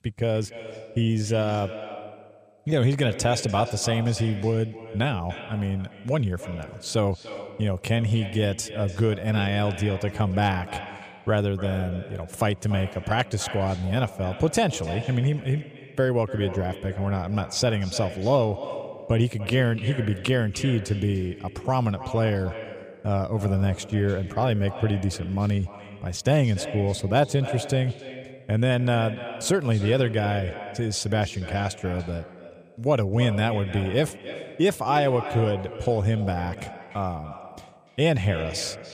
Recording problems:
echo of what is said; noticeable; throughout; 290 ms later, 15 dB below the speech

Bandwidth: 14.5 kHz